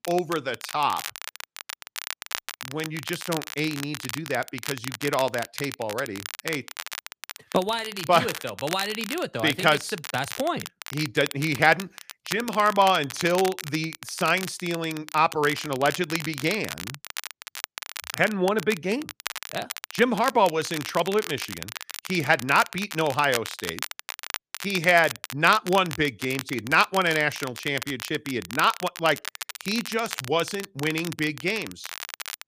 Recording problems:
crackle, like an old record; noticeable; 10 dB below the speech

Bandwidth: 15 kHz